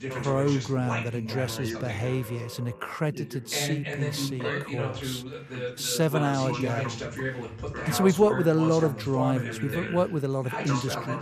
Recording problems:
background chatter; loud; throughout; 2 voices, 5 dB below the speech

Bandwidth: 14.5 kHz